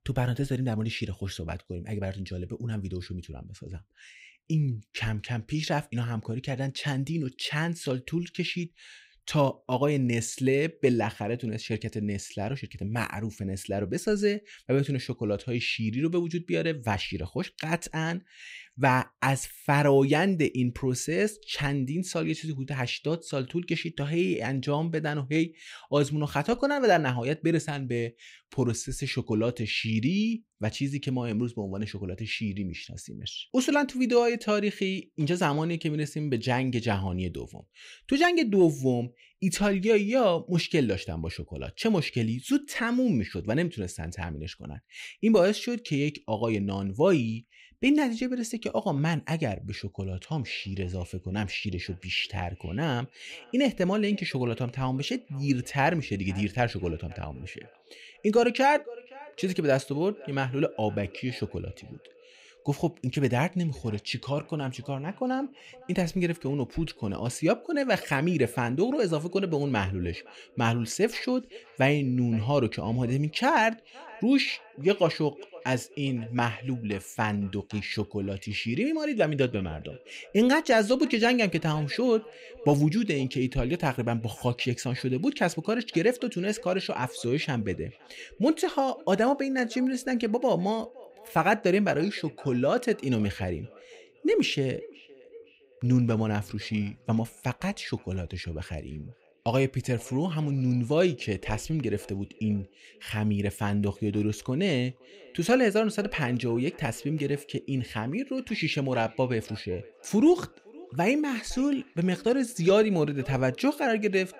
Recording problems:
echo of what is said; faint; from 50 s on; 510 ms later, 25 dB below the speech

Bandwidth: 15.5 kHz